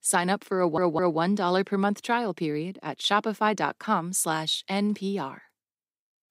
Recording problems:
audio stuttering; at 0.5 s

